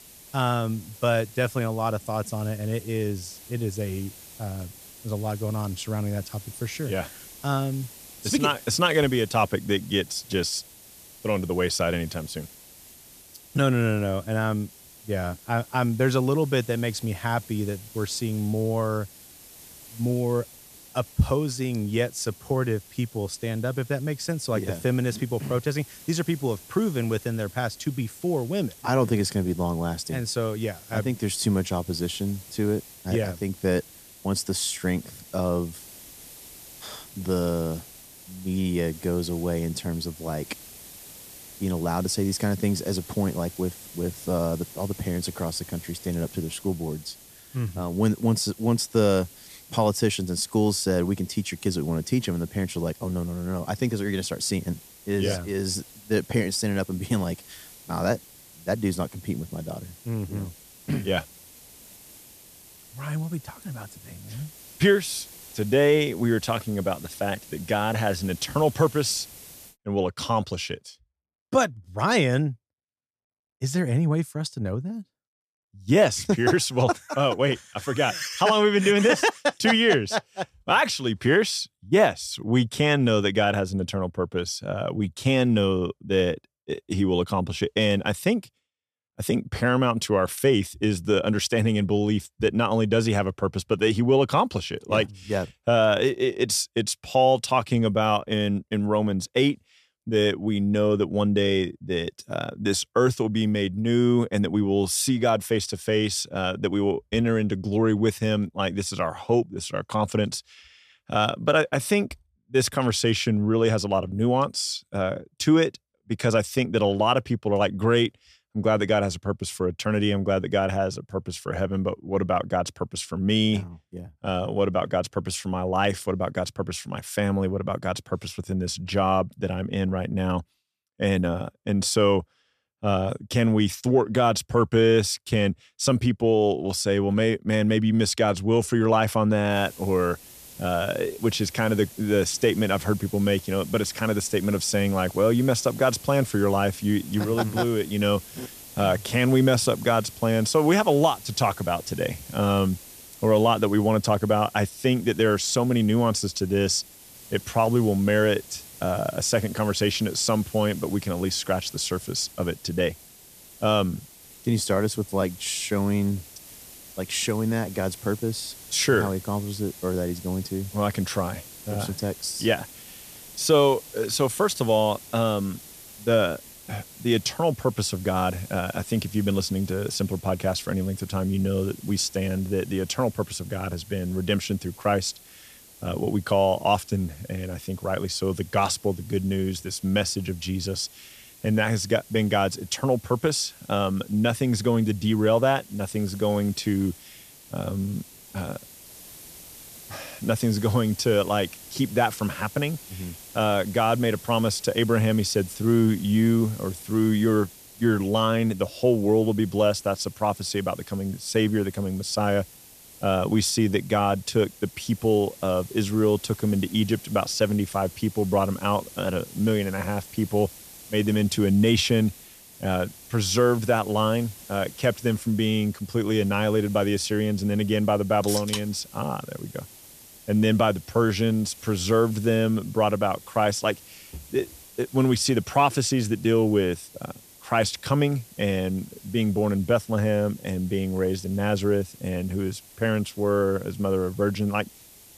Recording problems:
hiss; noticeable; until 1:10 and from 2:20 on; 20 dB below the speech

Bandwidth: 14.5 kHz